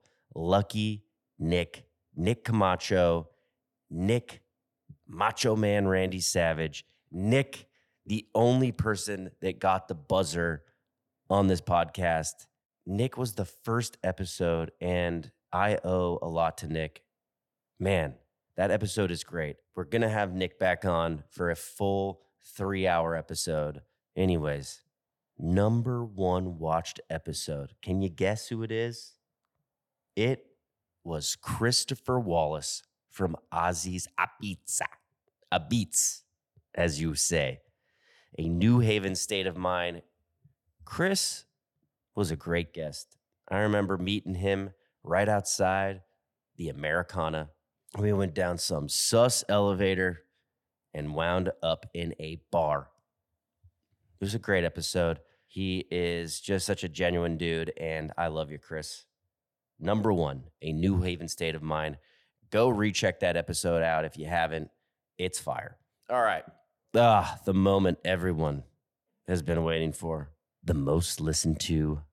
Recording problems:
none

